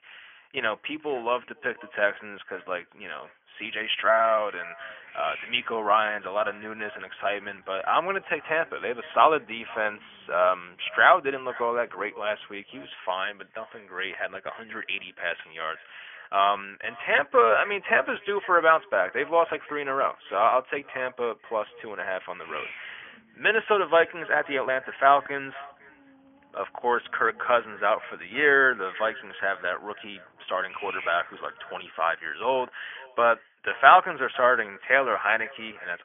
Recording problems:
thin; very; fading below 650 Hz
high frequencies cut off; severe; nothing above 3.5 kHz
echo of what is said; faint; throughout; 500 ms later, 25 dB below the speech
garbled, watery; slightly
hiss; noticeable; from 5 to 13 s and from 22 to 32 s; 20 dB below the speech

